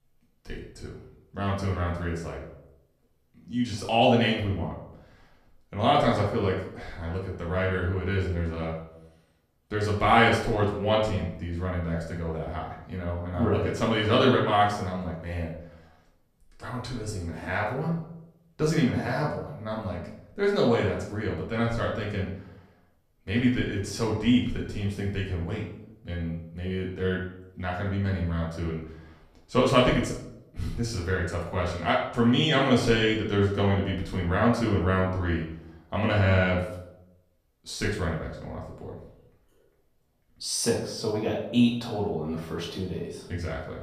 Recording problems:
off-mic speech; far
room echo; noticeable; dies away in 0.6 s

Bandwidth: 14.5 kHz